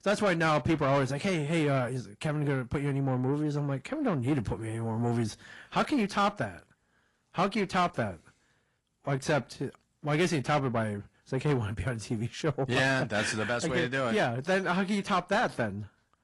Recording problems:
distortion; slight; 10 dB below the speech
garbled, watery; slightly; nothing above 11 kHz

